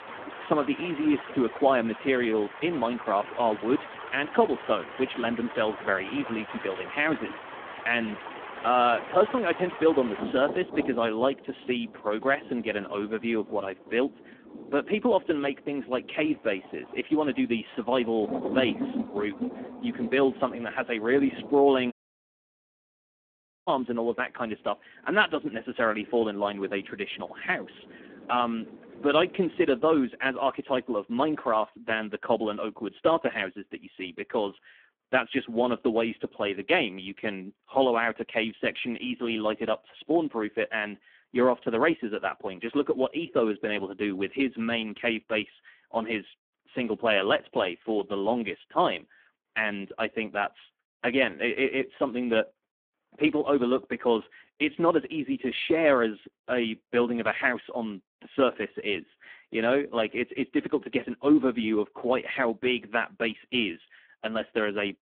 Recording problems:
phone-call audio; poor line
rain or running water; noticeable; until 30 s; 10 dB below the speech
audio cutting out; at 22 s for 2 s

